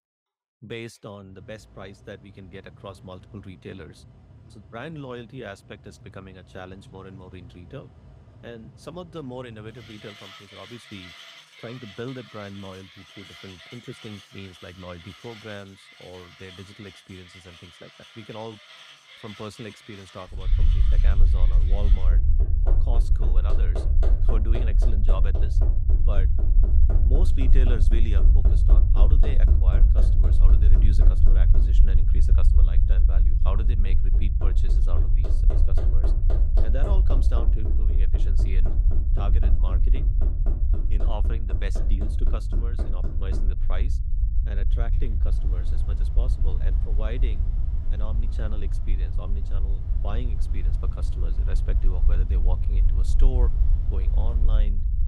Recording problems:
machinery noise; loud; throughout; 4 dB below the speech
low rumble; loud; from 20 s on; 3 dB below the speech

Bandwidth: 15.5 kHz